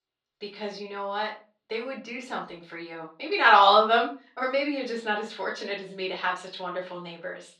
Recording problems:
off-mic speech; far
room echo; slight; dies away in 0.3 s
muffled; very slightly; fading above 4 kHz
thin; very slightly; fading below 650 Hz

